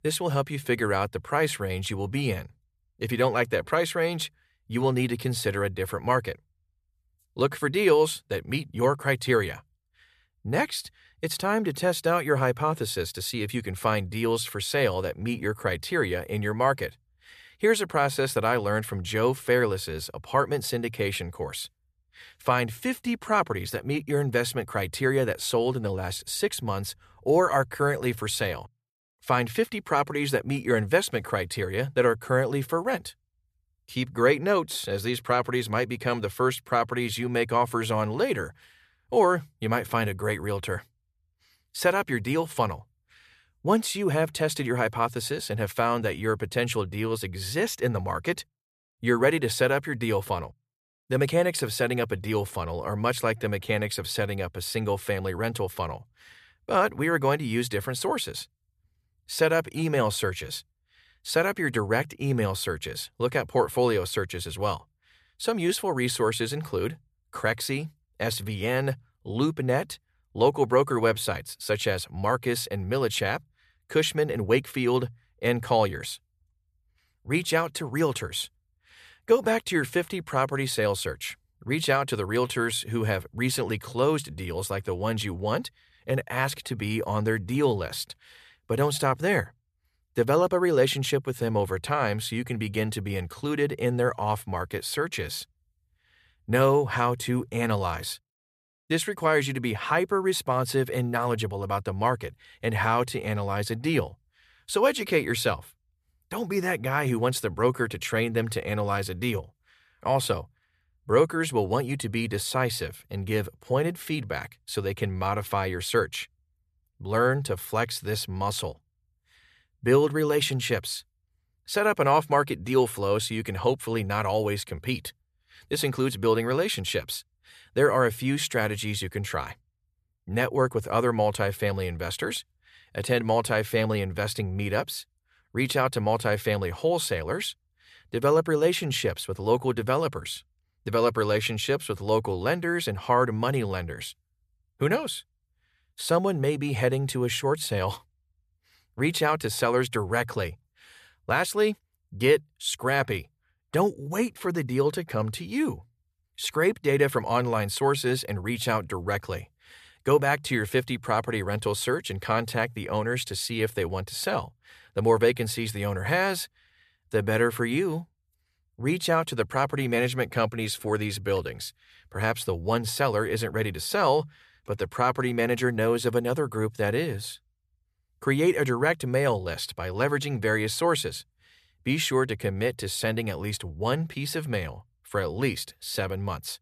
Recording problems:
none

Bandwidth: 14.5 kHz